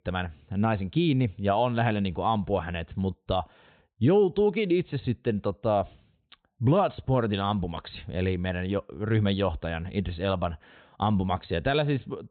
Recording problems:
high frequencies cut off; severe; nothing above 4 kHz

